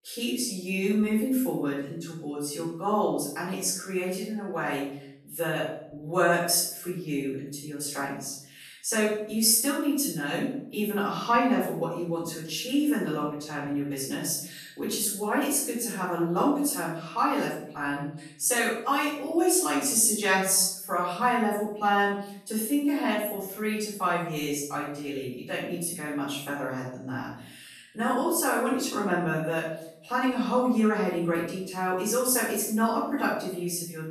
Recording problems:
off-mic speech; far
room echo; noticeable; dies away in 0.6 s

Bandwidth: 13.5 kHz